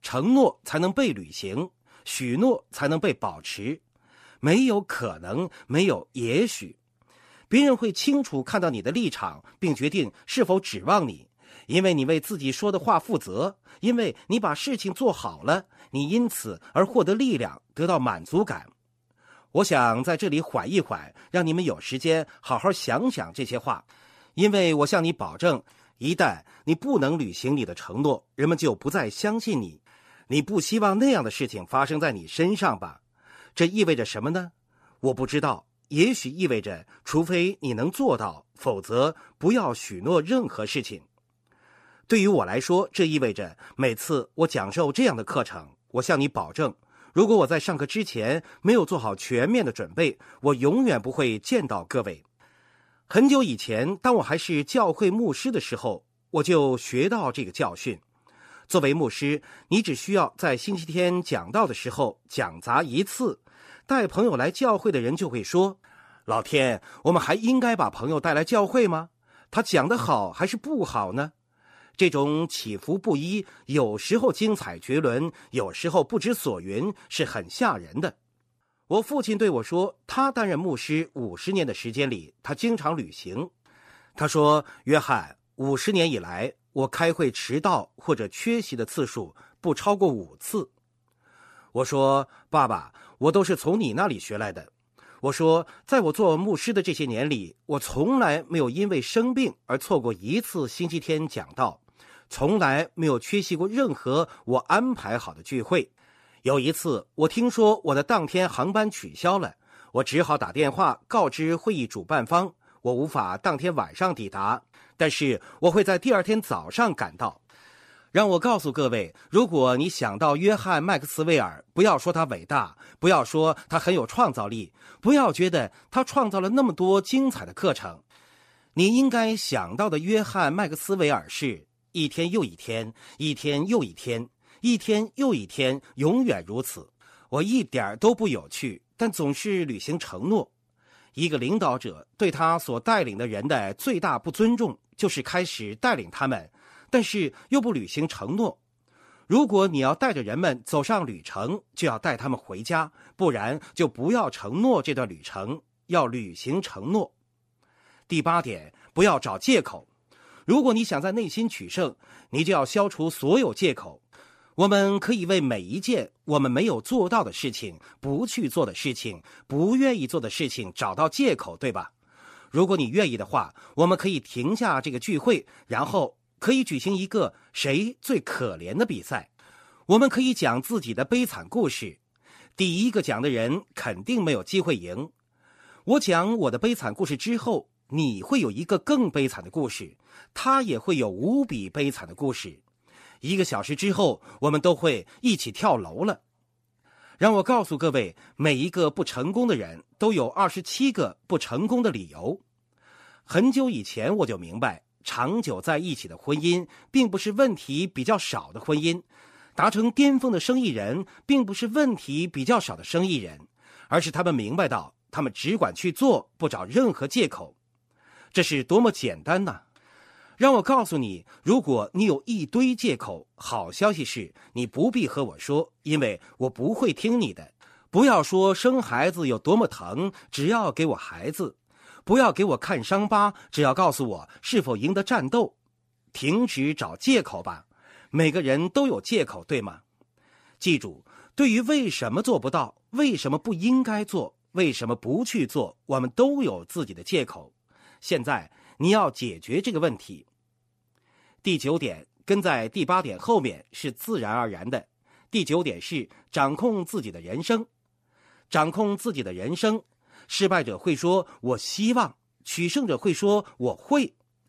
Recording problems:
none

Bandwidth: 14.5 kHz